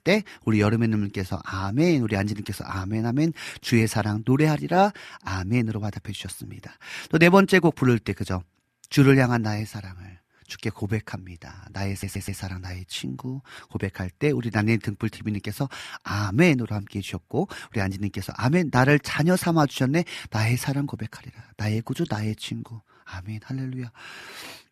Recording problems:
audio stuttering; at 12 s

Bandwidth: 14.5 kHz